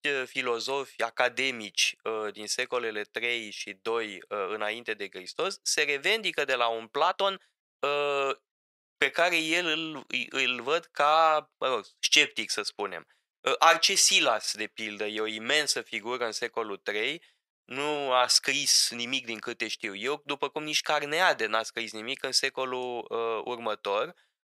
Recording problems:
thin; very; fading below 650 Hz
uneven, jittery; strongly; from 7 to 19 s

